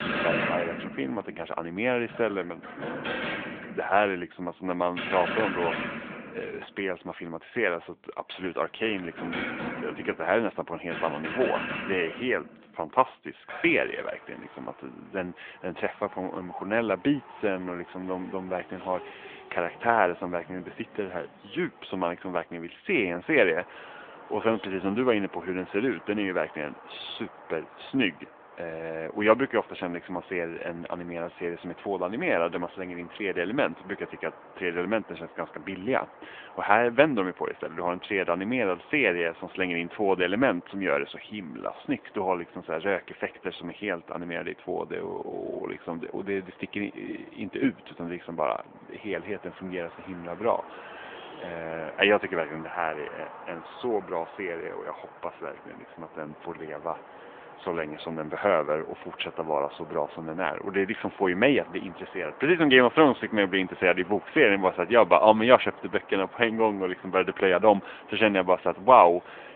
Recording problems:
phone-call audio
traffic noise; noticeable; throughout; 15 dB below the speech

